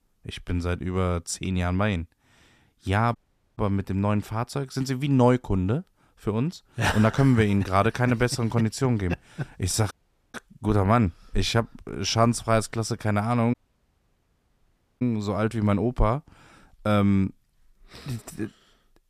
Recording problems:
audio cutting out; at 3 s, at 10 s and at 14 s for 1.5 s

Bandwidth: 14.5 kHz